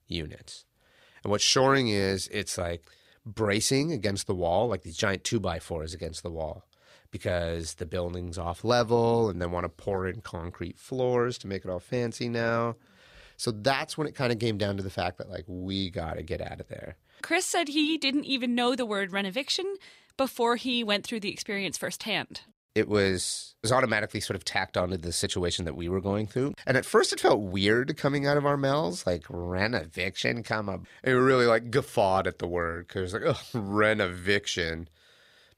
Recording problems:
none

